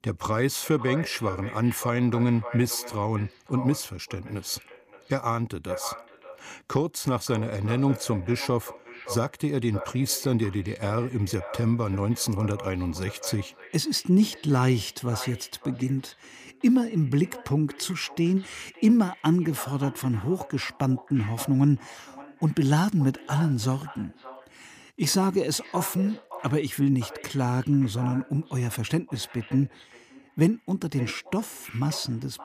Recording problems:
echo of what is said; noticeable; throughout; 570 ms later, 15 dB below the speech

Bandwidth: 15 kHz